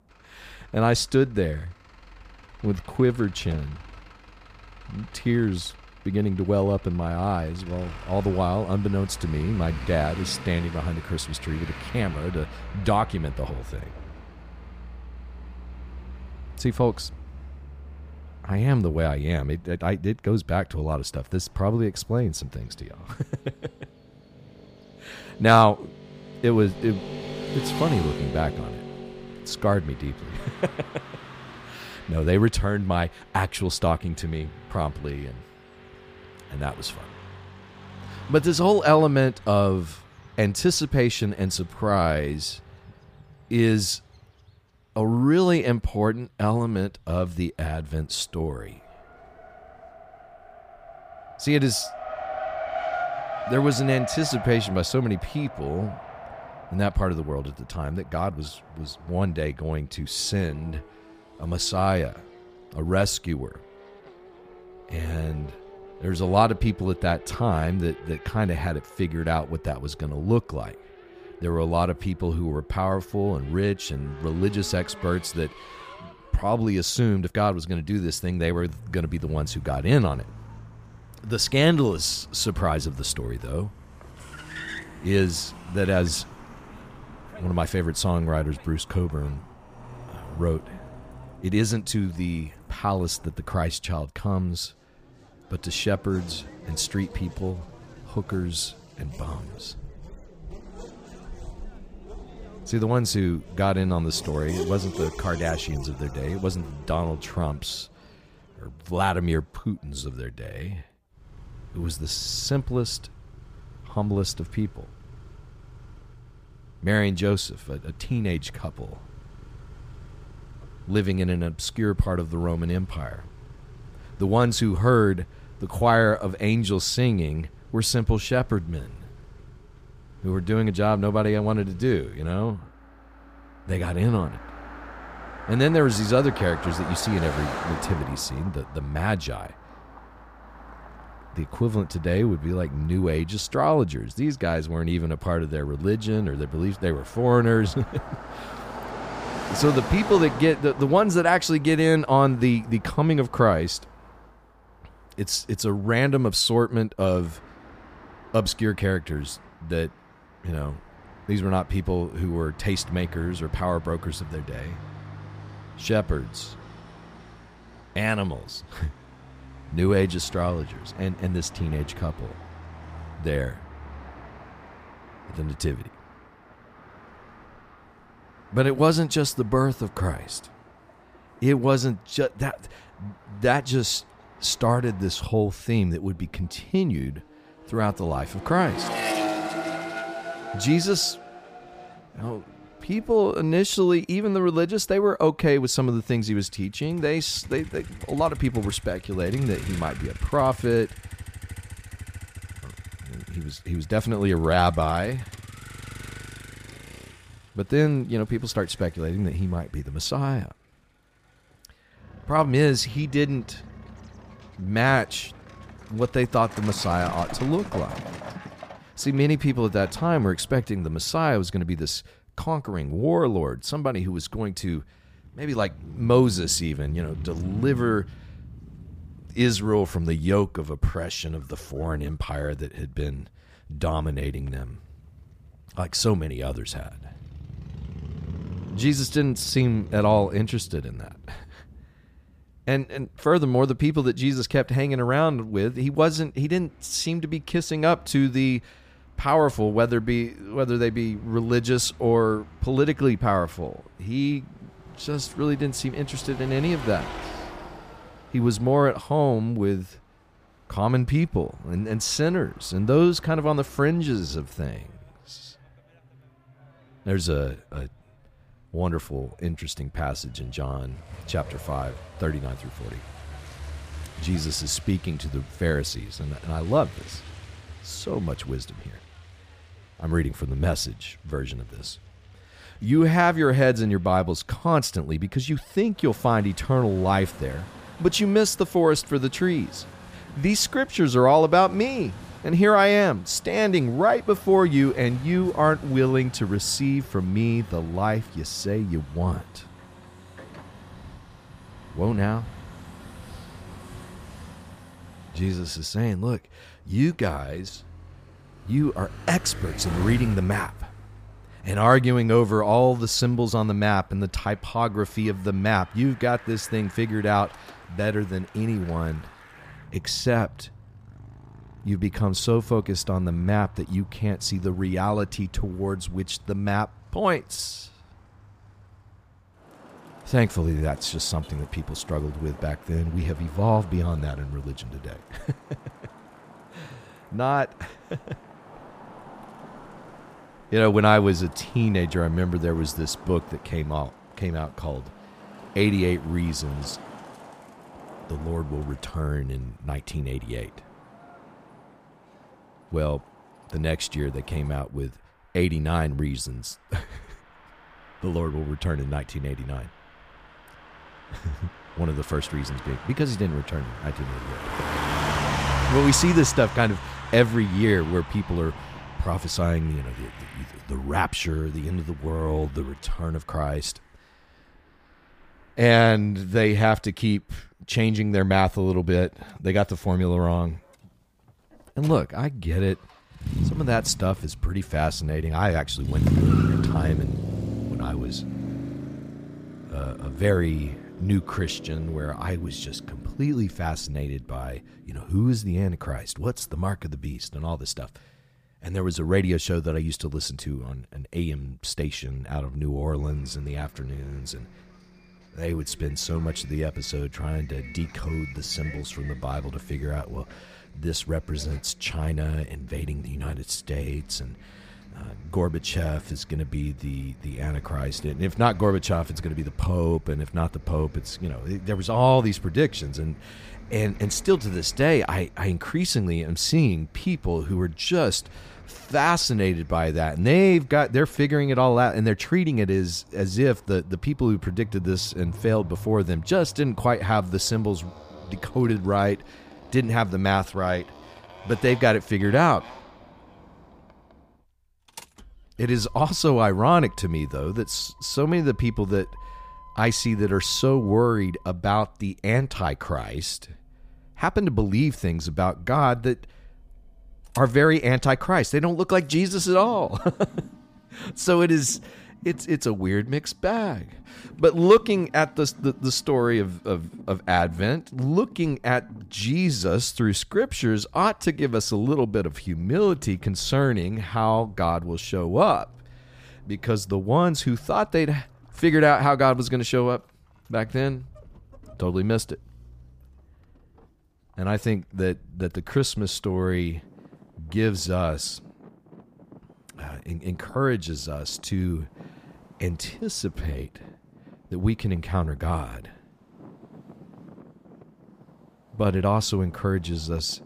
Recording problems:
traffic noise; noticeable; throughout; 15 dB below the speech
uneven, jittery; strongly; from 2.5 s to 7:52

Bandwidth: 15 kHz